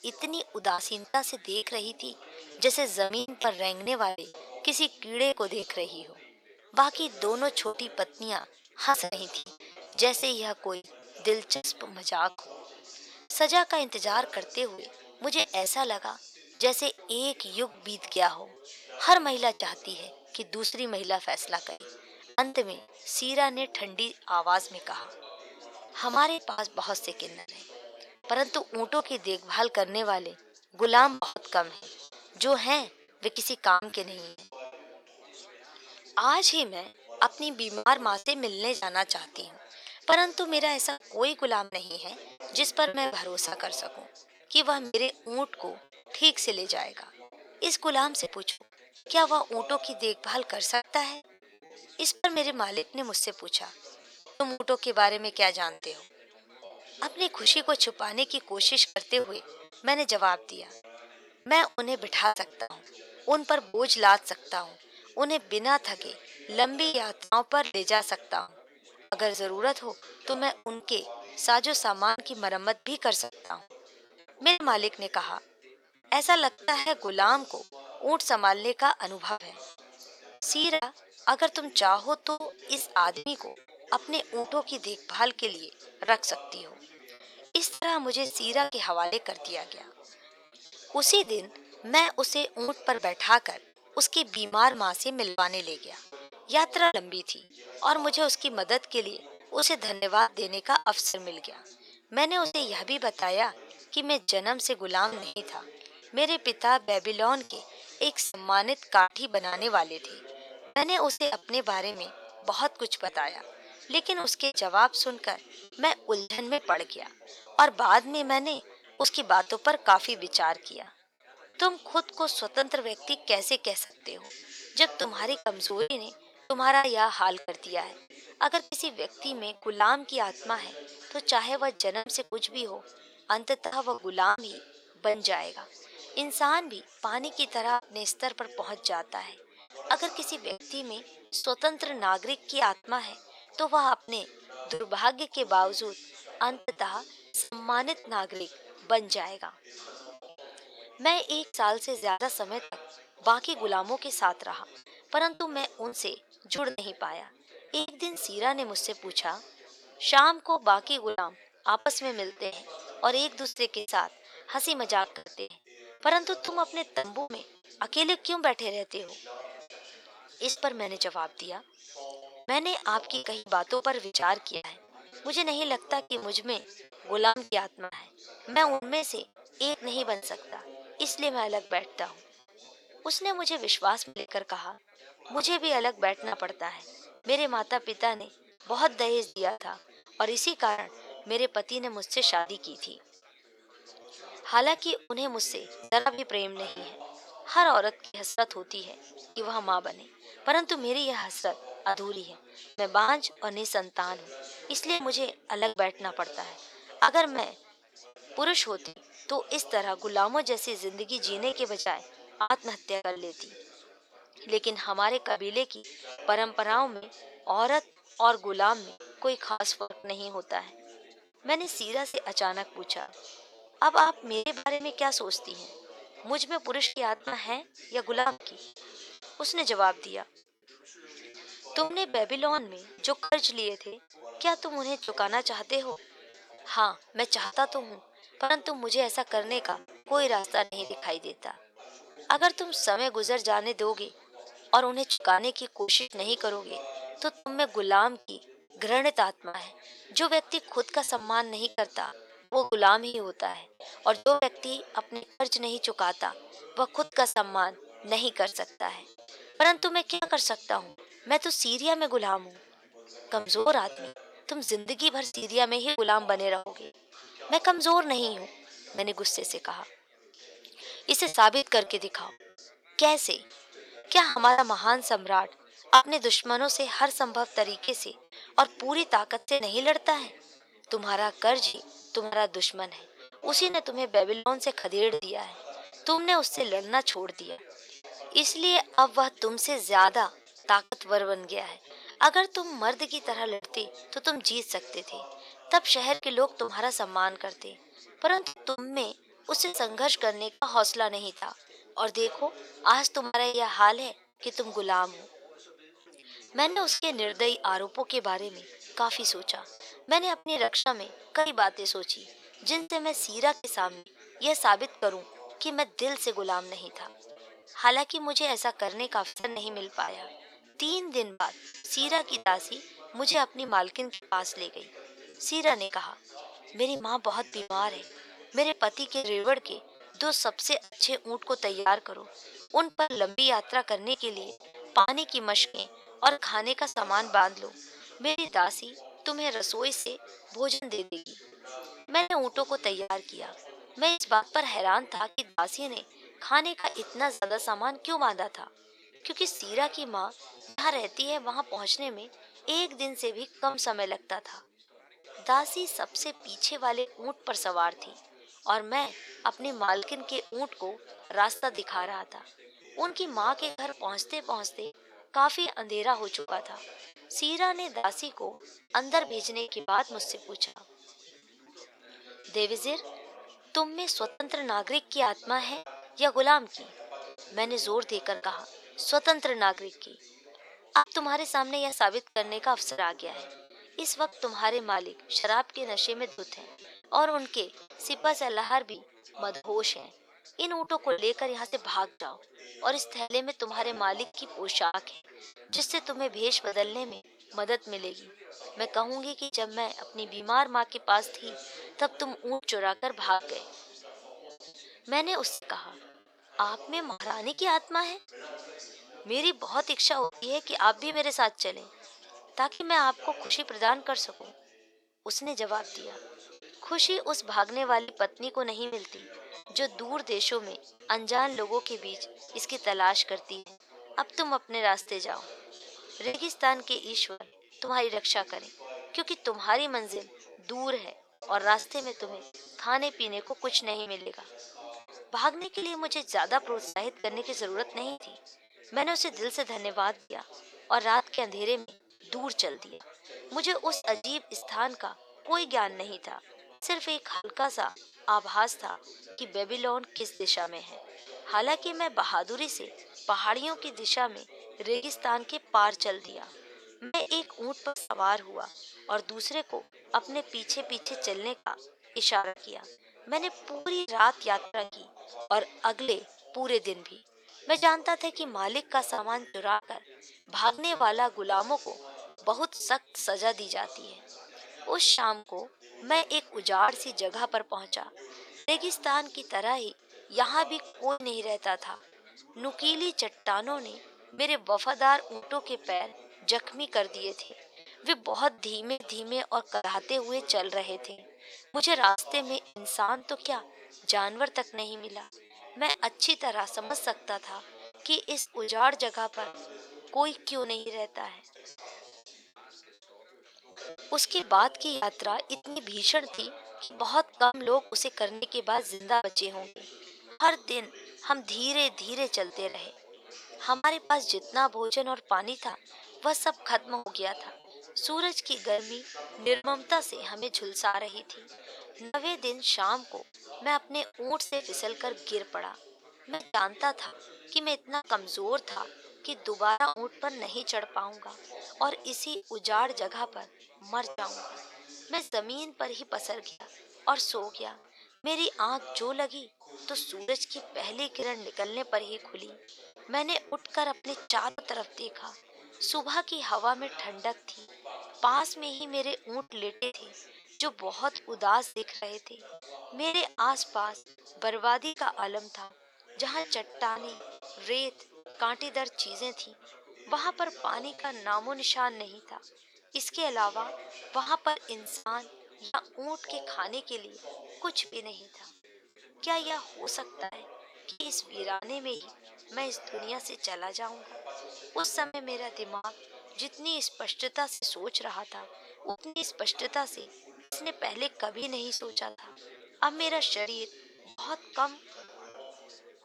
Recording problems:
thin; very; fading below 550 Hz
background chatter; faint; throughout; 4 voices, 20 dB below the speech
choppy; very; 9% of the speech affected

